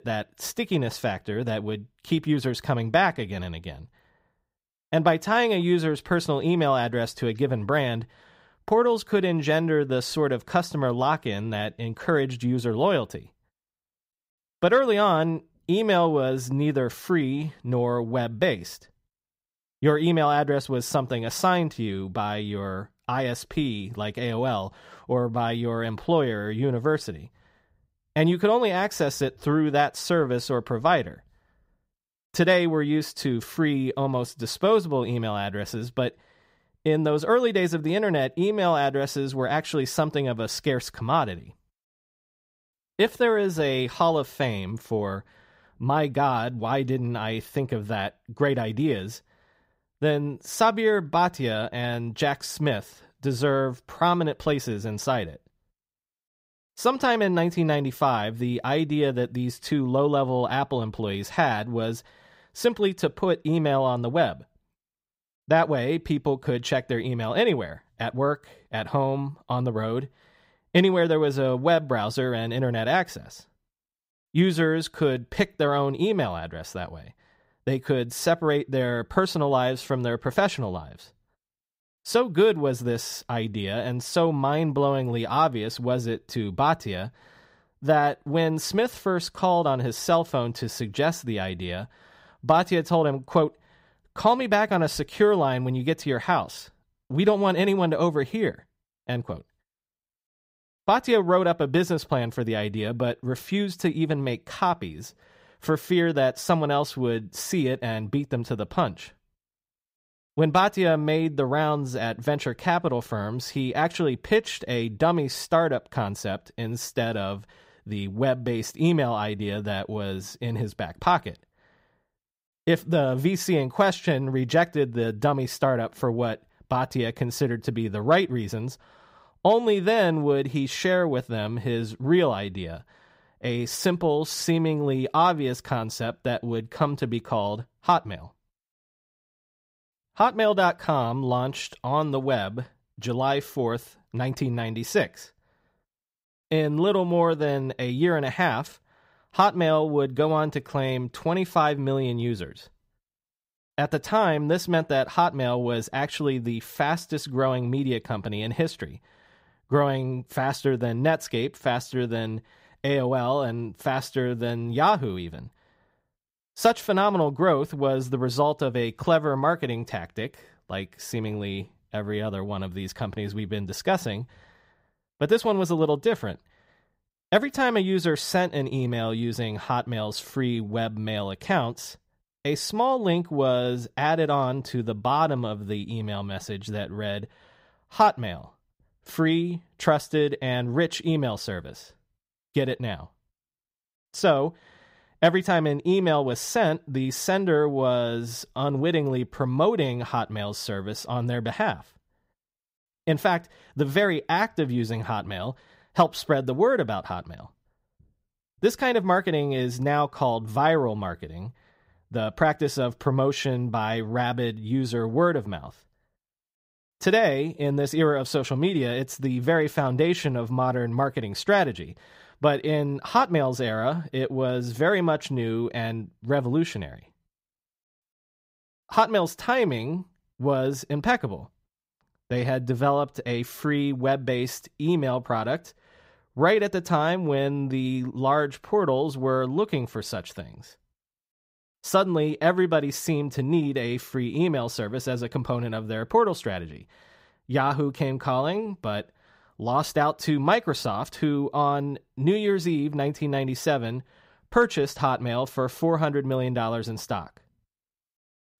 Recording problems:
none

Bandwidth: 15.5 kHz